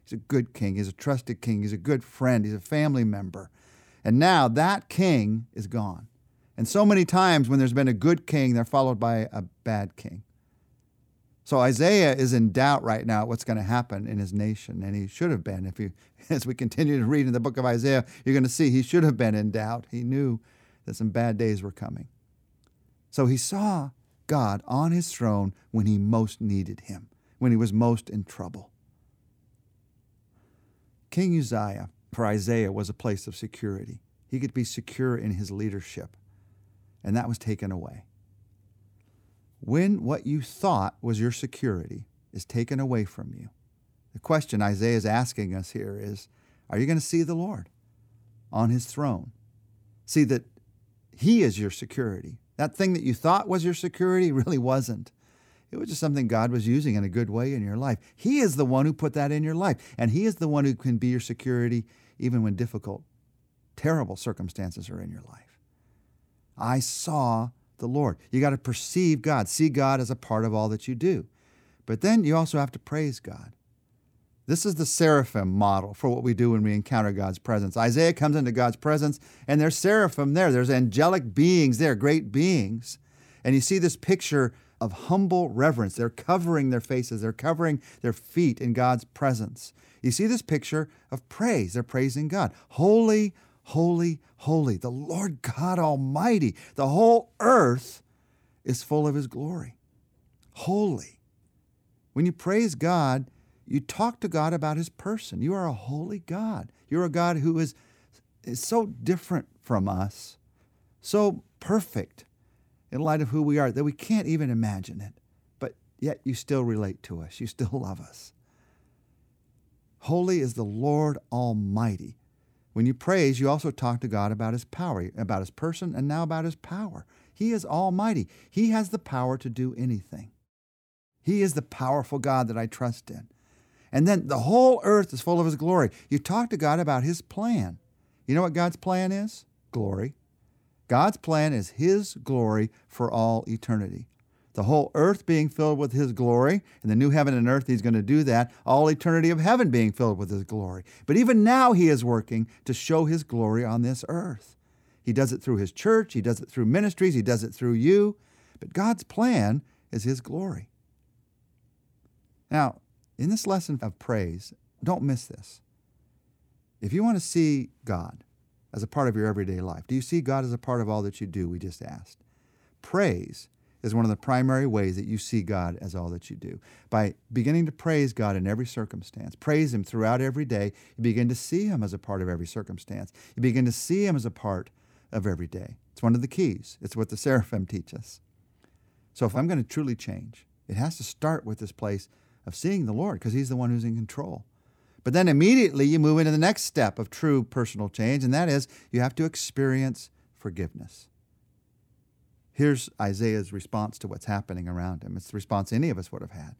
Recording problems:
none

